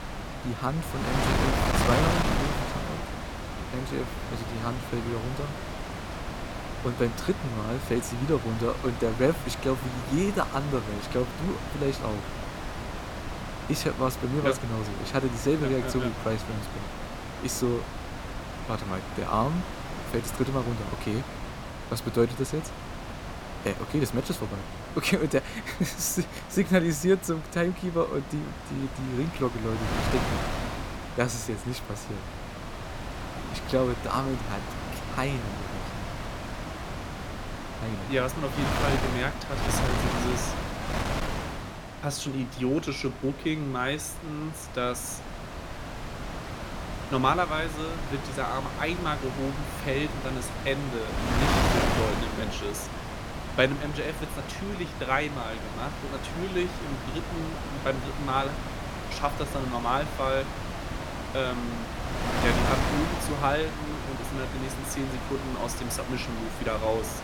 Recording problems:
wind noise on the microphone; heavy; 3 dB below the speech

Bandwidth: 17.5 kHz